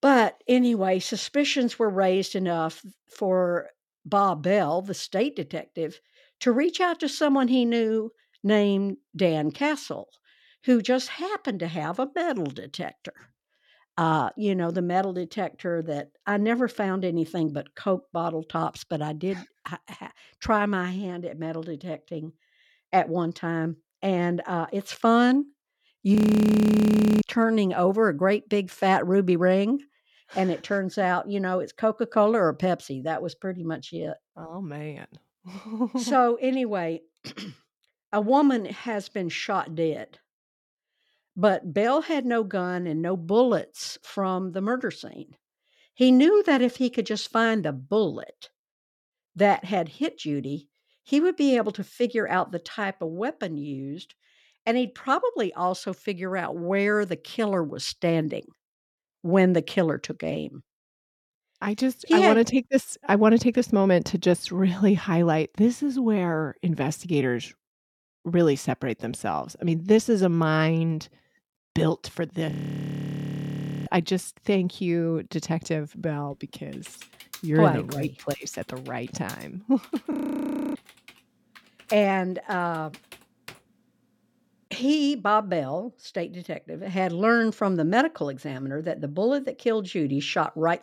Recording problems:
audio freezing; at 26 s for 1 s, at 1:13 for 1.5 s and at 1:20 for 0.5 s
keyboard typing; faint; from 1:17 to 1:24; peak 15 dB below the speech

